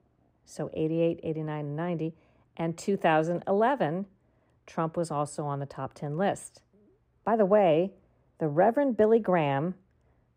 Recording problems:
muffled; very; fading above 2.5 kHz

